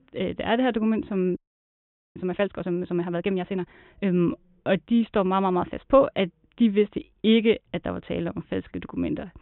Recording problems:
high frequencies cut off; severe; nothing above 3.5 kHz
audio freezing; at 1.5 s for 1 s

